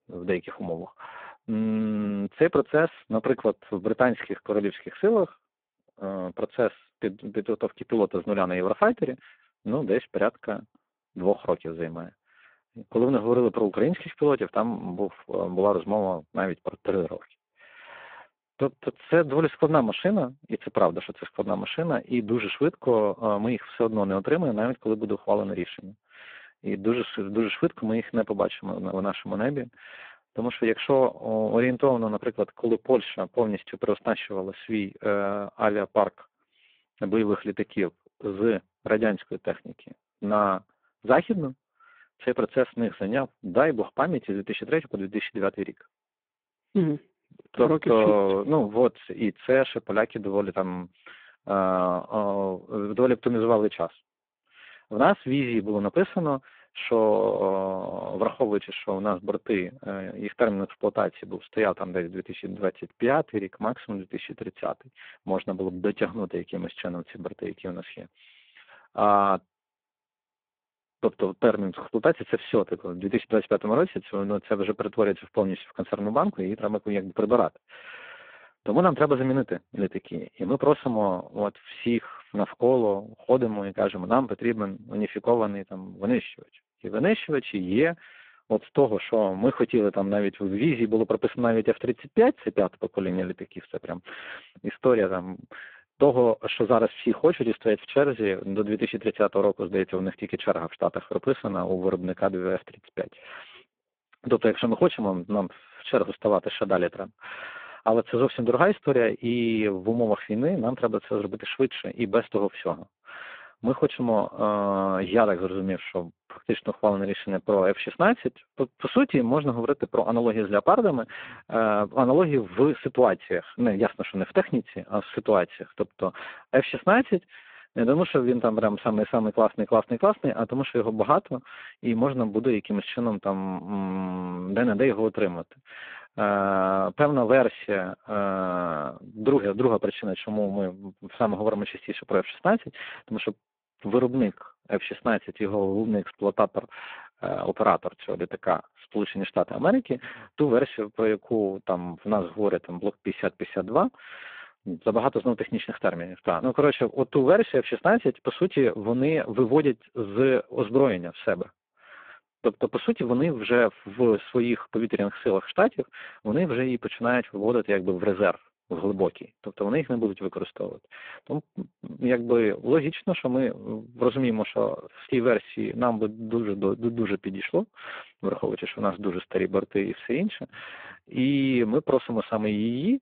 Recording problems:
phone-call audio; poor line

